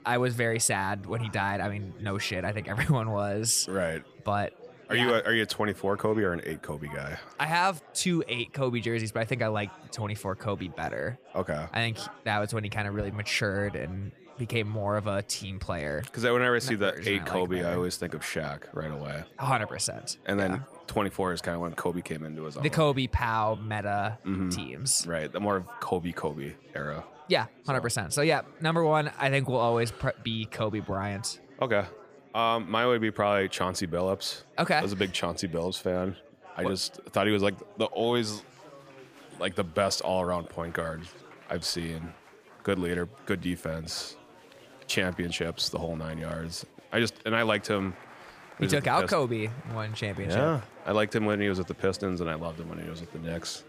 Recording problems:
murmuring crowd; faint; throughout; 20 dB below the speech

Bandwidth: 15 kHz